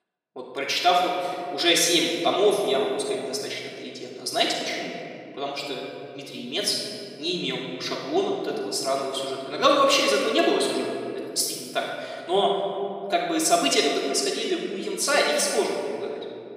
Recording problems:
off-mic speech; far
room echo; noticeable; dies away in 2.8 s
thin; somewhat; fading below 400 Hz

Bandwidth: 15.5 kHz